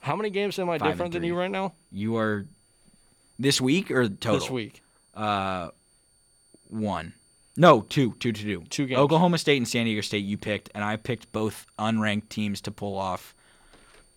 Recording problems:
high-pitched whine; faint; throughout; 9 kHz, 35 dB below the speech

